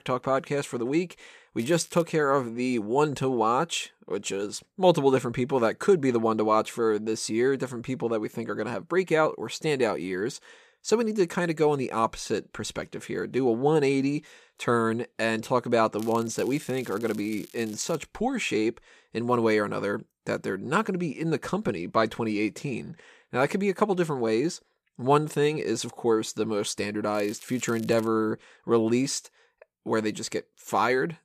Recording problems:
crackling; faint; at 1.5 s, from 16 to 18 s and at 27 s; 20 dB below the speech

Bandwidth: 14.5 kHz